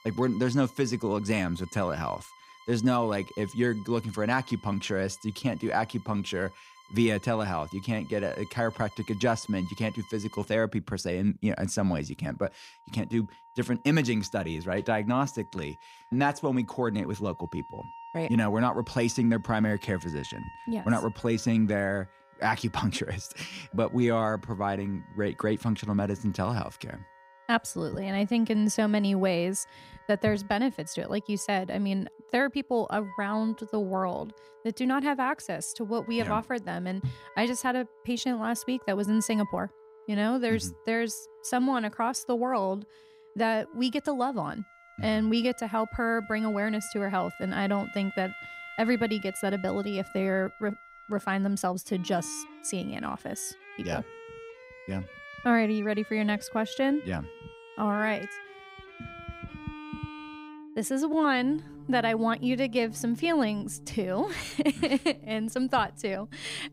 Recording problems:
background music; noticeable; throughout; 20 dB below the speech

